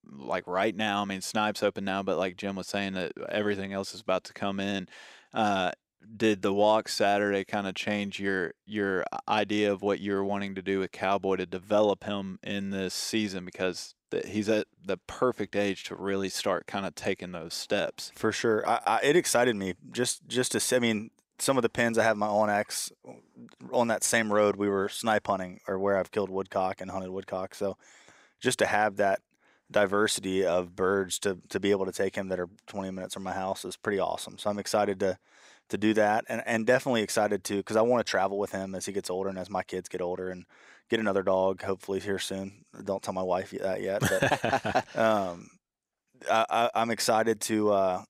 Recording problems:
none

